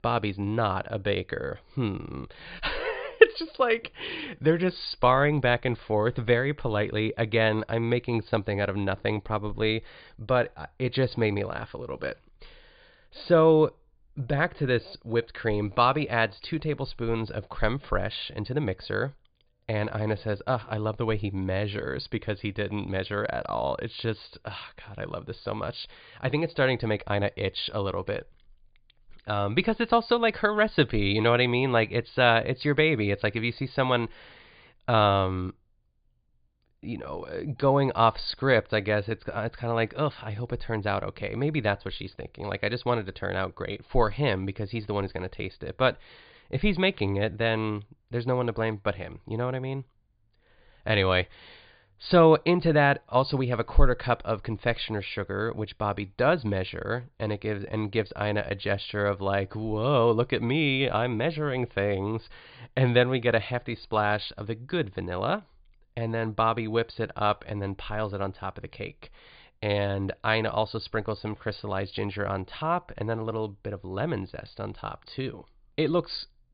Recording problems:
high frequencies cut off; severe; nothing above 5 kHz

